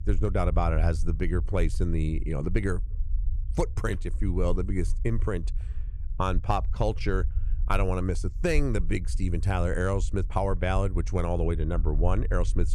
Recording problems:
low rumble; faint; throughout; 20 dB below the speech

